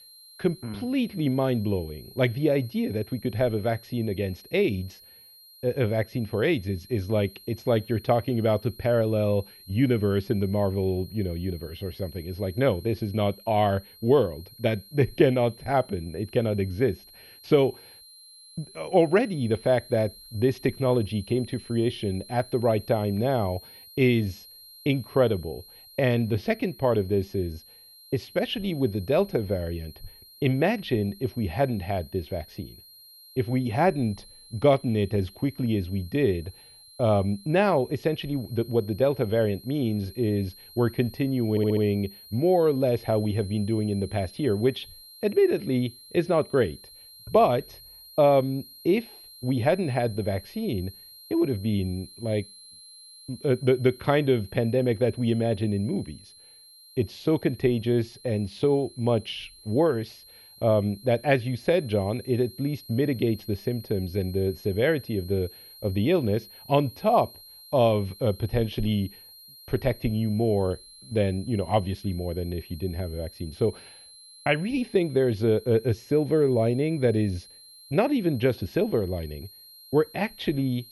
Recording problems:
muffled; very; fading above 2.5 kHz
high-pitched whine; faint; throughout; 4 kHz, 20 dB below the speech
audio stuttering; at 42 s

